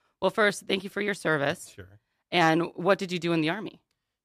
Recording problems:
none

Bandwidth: 14.5 kHz